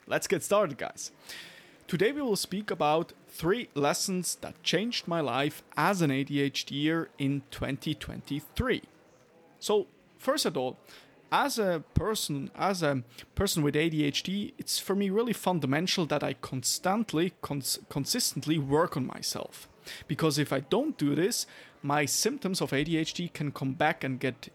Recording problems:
murmuring crowd; faint; throughout; 30 dB below the speech

